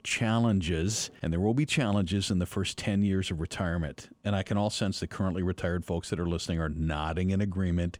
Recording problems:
none

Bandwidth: 18 kHz